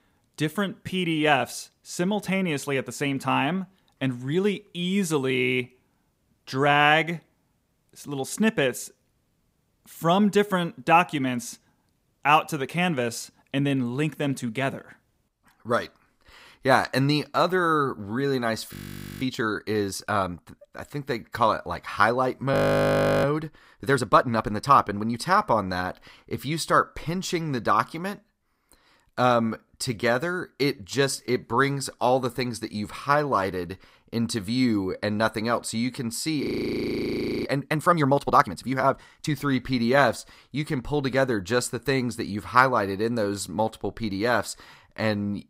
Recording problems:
audio freezing; at 19 s, at 23 s for 0.5 s and at 36 s for 1 s

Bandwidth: 15.5 kHz